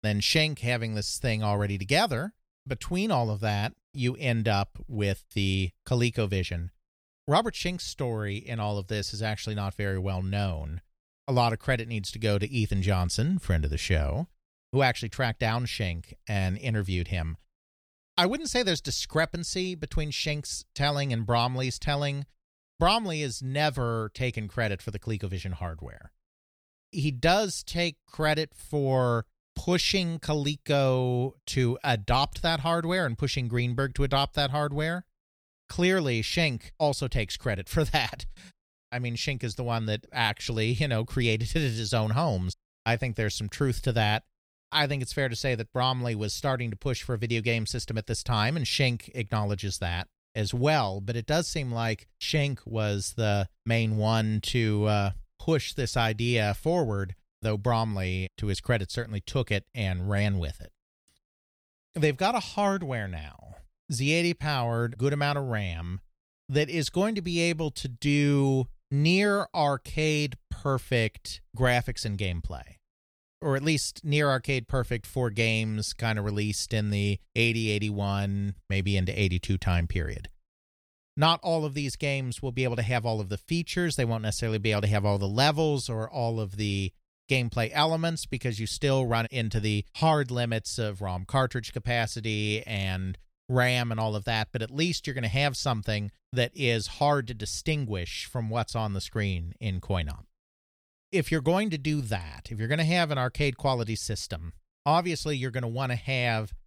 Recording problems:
none

